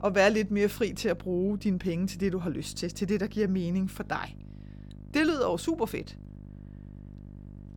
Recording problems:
electrical hum; faint; throughout; 50 Hz, 25 dB below the speech

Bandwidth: 18 kHz